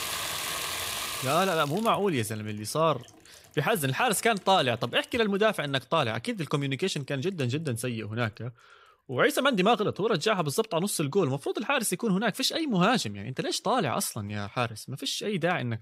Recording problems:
household noises; loud; throughout; 5 dB below the speech

